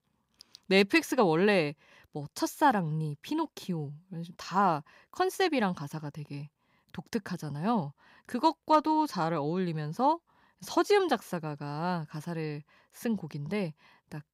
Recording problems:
none

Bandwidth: 15.5 kHz